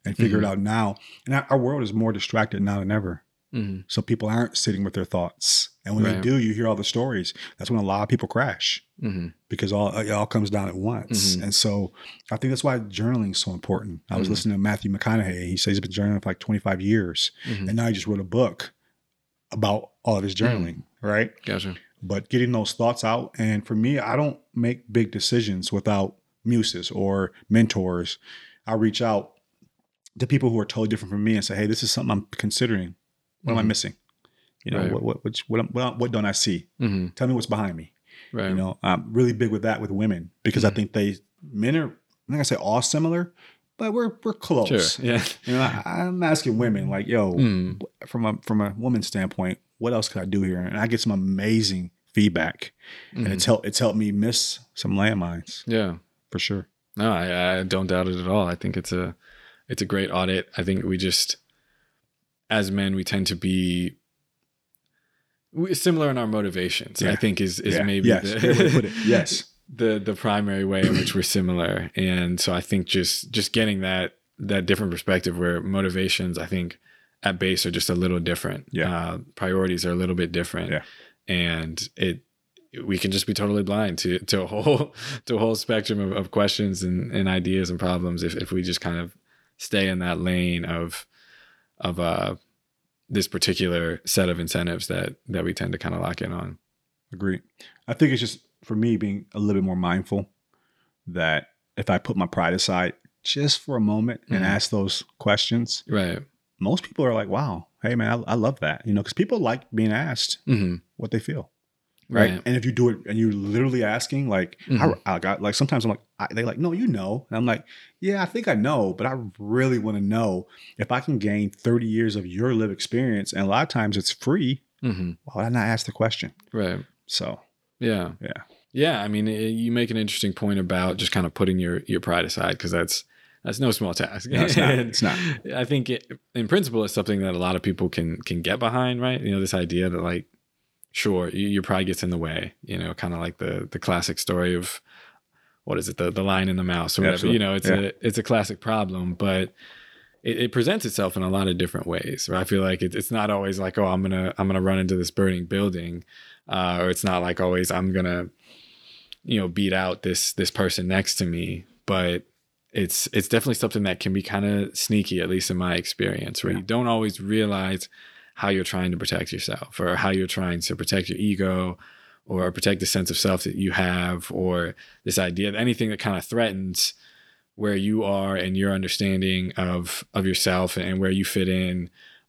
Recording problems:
none

